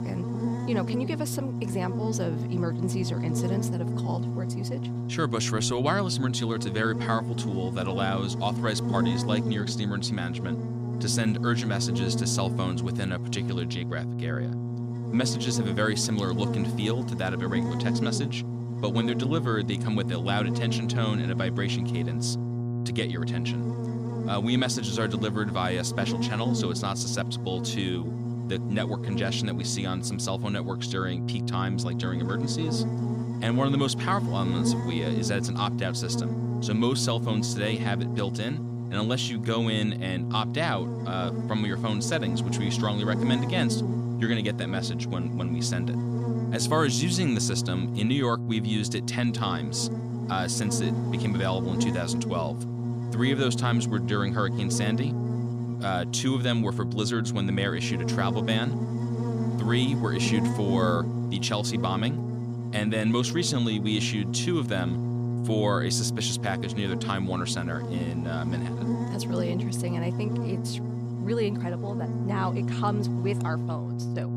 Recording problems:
electrical hum; loud; throughout; 60 Hz, 6 dB below the speech

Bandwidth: 14.5 kHz